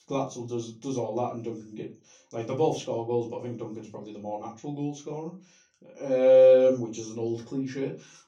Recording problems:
off-mic speech; far
room echo; very slight; dies away in 0.3 s

